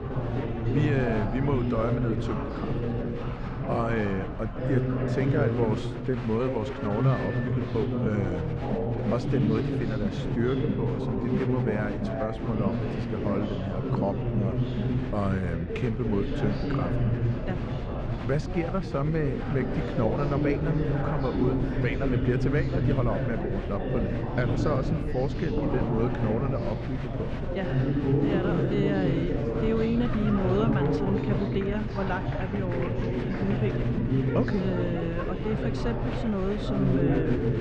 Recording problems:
muffled; slightly; fading above 2.5 kHz
echo of what is said; faint; throughout; 240 ms later, 20 dB below the speech
chatter from many people; very loud; throughout; 1 dB above the speech
low rumble; noticeable; throughout; 20 dB below the speech
phone ringing; noticeable; from 6.5 to 7.5 s; peak 10 dB below the speech

